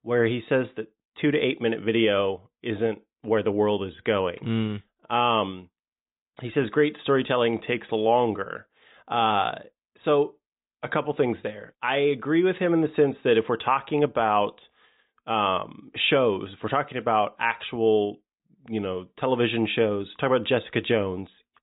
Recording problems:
high frequencies cut off; severe; nothing above 4 kHz

